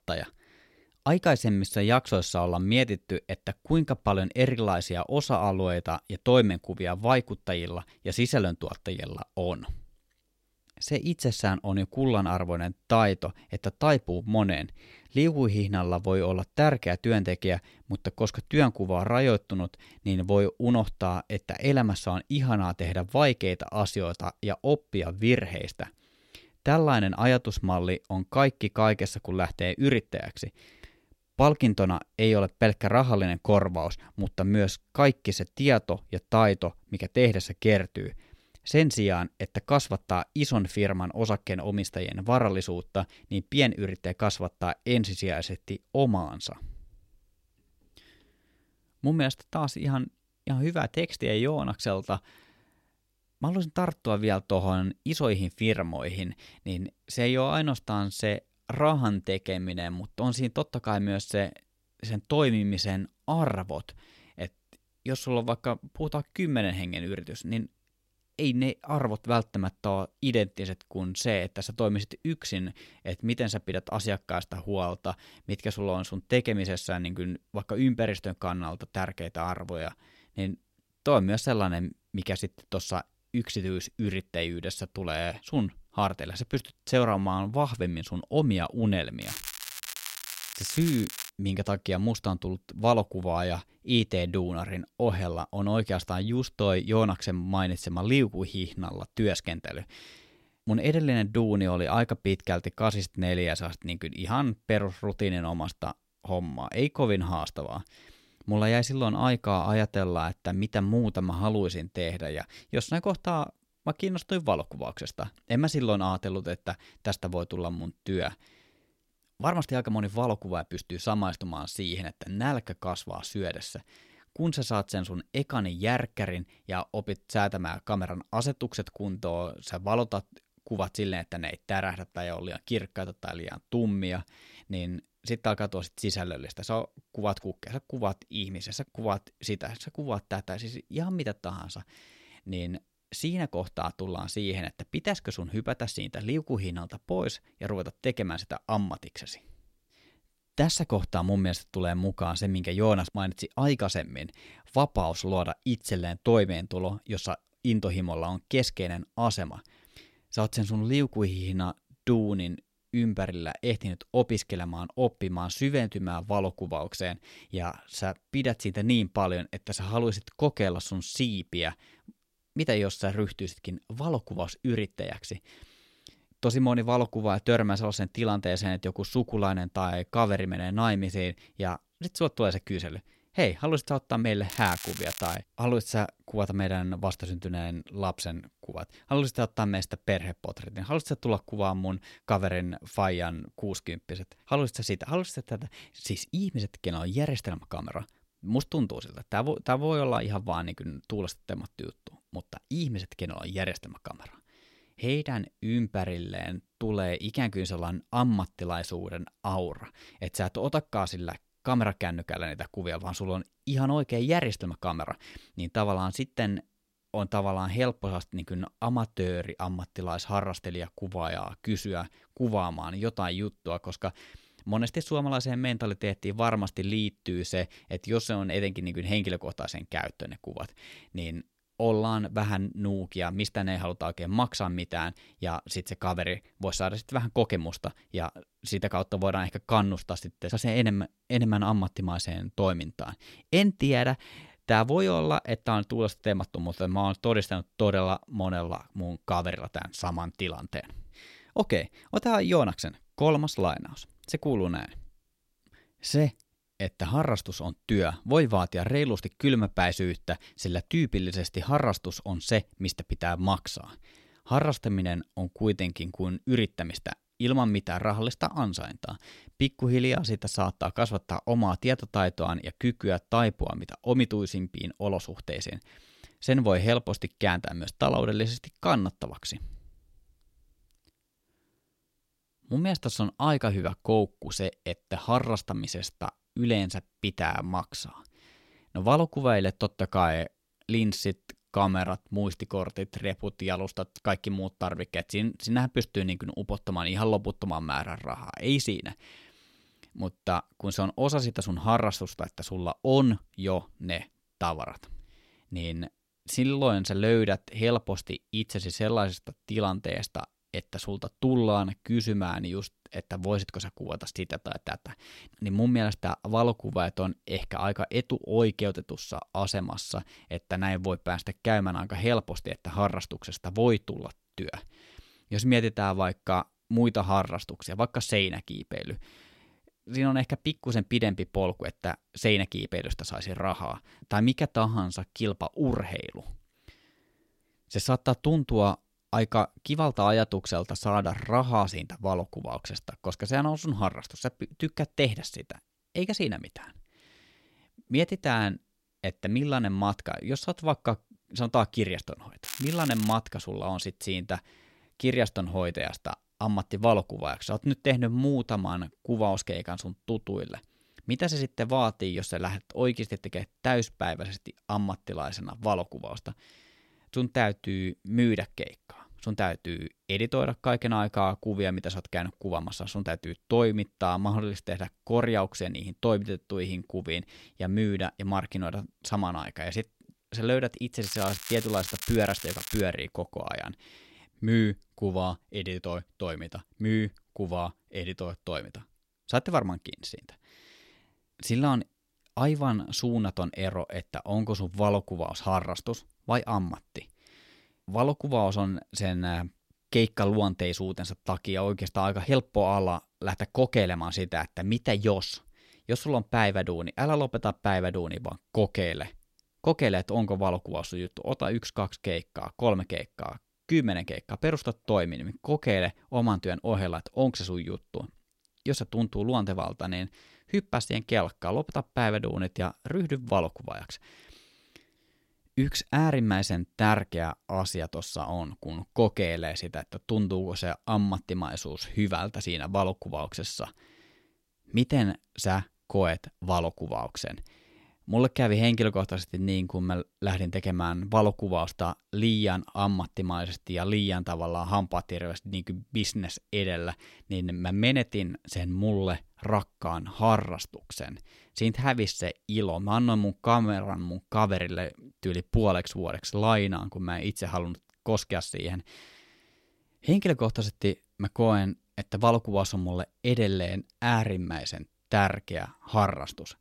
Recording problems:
crackling; loud; 4 times, first at 1:29; 8 dB below the speech

